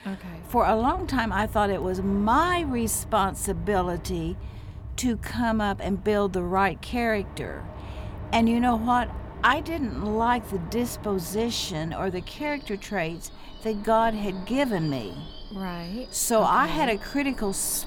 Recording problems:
train or aircraft noise; noticeable; throughout; 15 dB below the speech

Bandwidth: 17 kHz